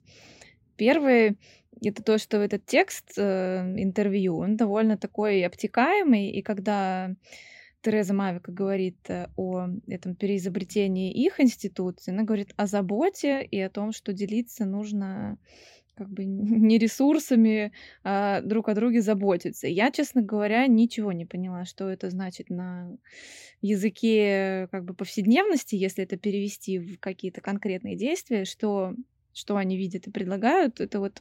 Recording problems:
none

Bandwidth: 16 kHz